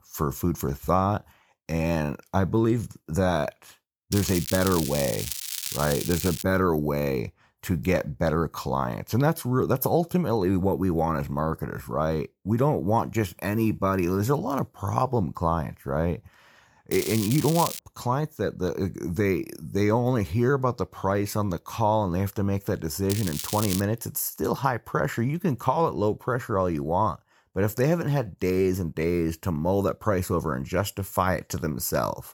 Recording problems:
crackling; loud; from 4 to 6.5 s, at 17 s and at 23 s; 6 dB below the speech

